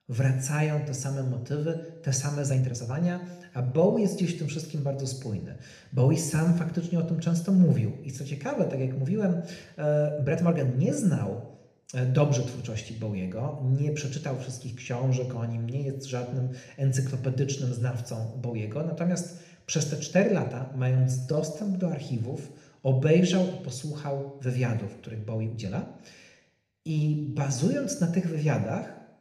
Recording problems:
room echo; slight; dies away in 0.8 s
off-mic speech; somewhat distant
uneven, jittery; strongly; from 2.5 to 28 s

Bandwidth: 14.5 kHz